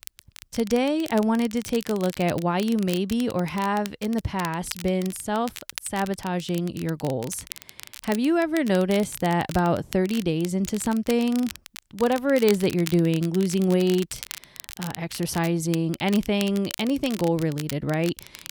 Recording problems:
crackle, like an old record; noticeable; 15 dB below the speech

